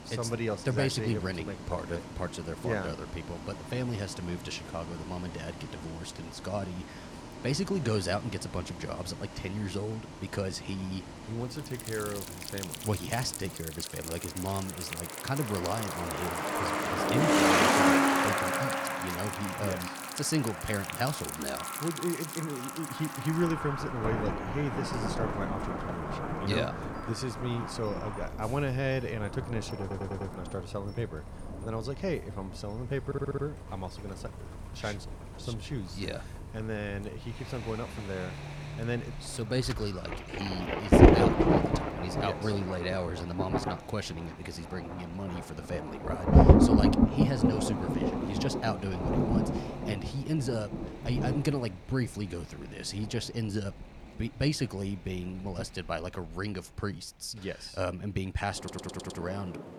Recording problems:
rain or running water; very loud; from 12 s on; 4 dB above the speech
traffic noise; loud; until 41 s; as loud as the speech
audio stuttering; at 30 s, at 33 s and at 59 s

